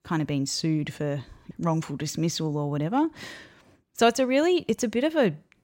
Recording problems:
none

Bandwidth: 16 kHz